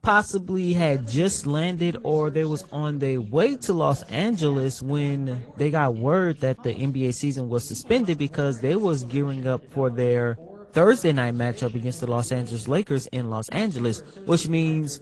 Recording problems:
garbled, watery; slightly; nothing above 10.5 kHz
voice in the background; faint; throughout; 20 dB below the speech

